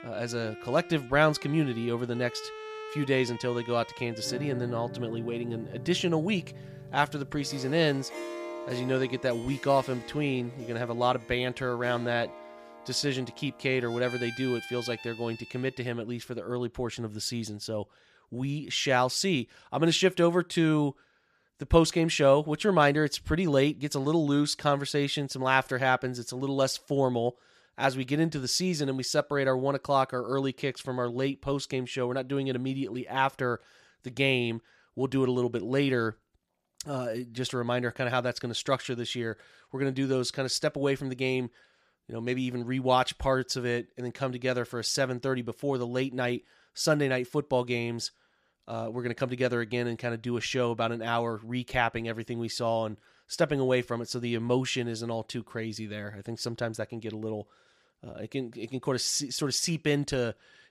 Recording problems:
background music; noticeable; until 15 s; 15 dB below the speech

